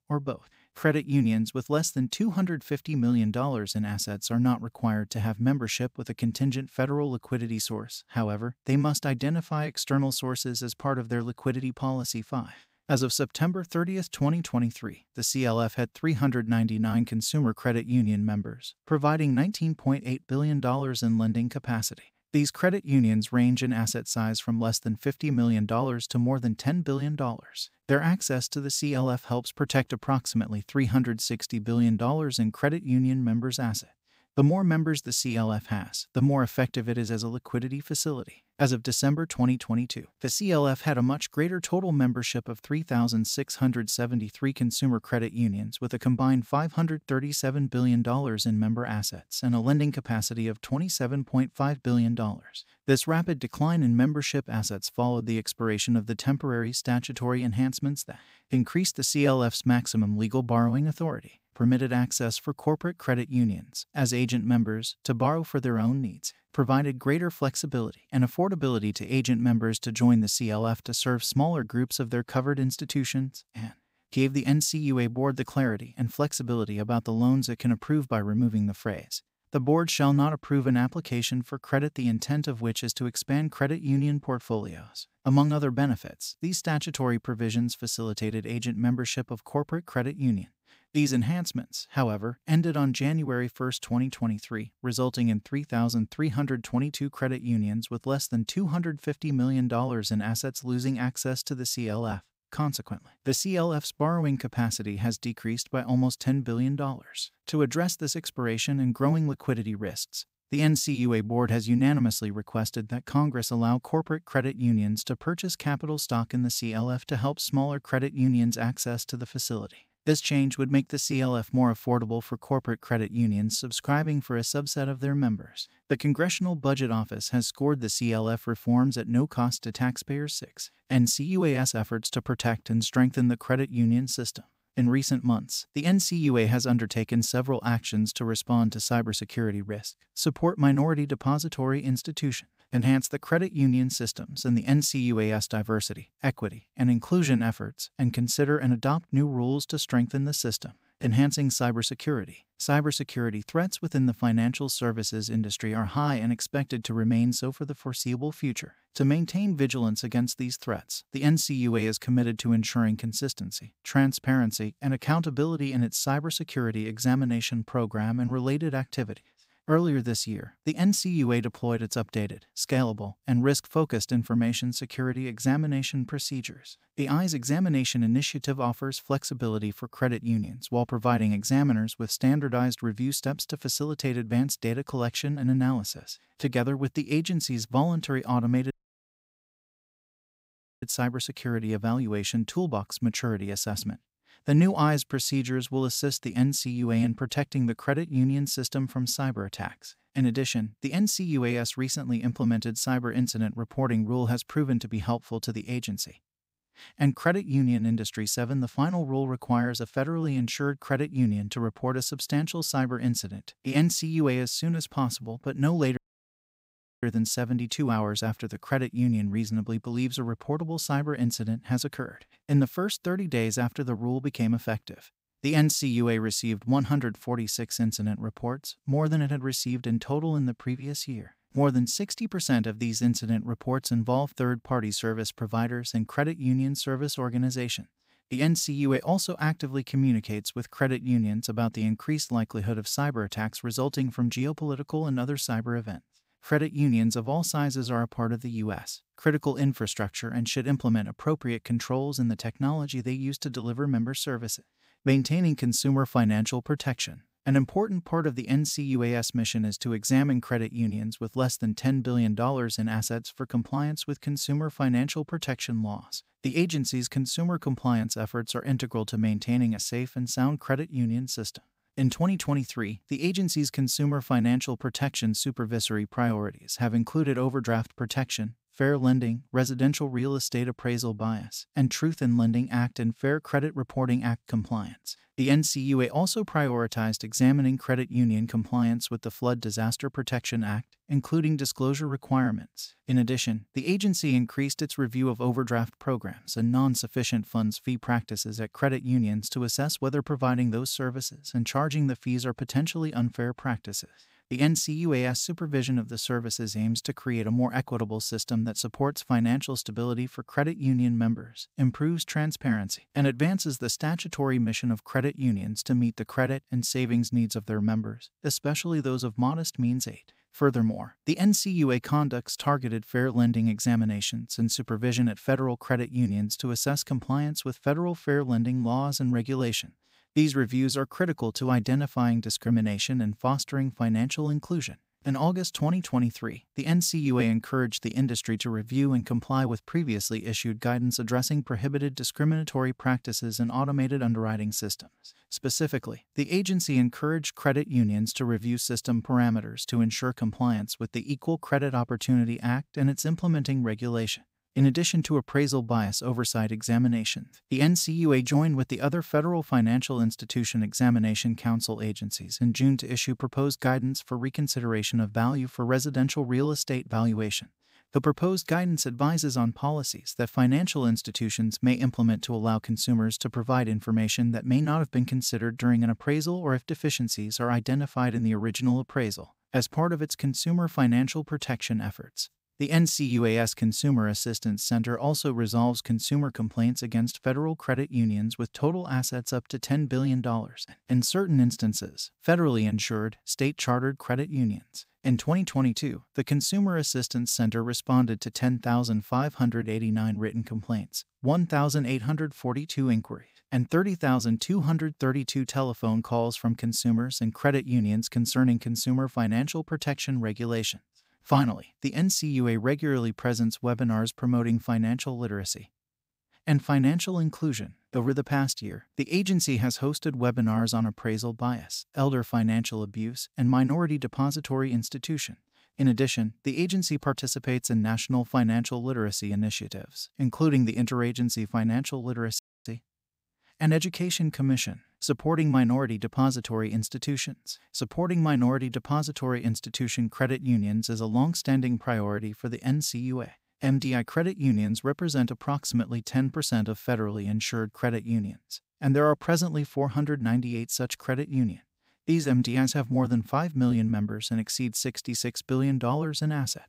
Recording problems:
audio cutting out; at 3:09 for 2 s, at 3:36 for 1 s and at 7:13

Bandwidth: 15.5 kHz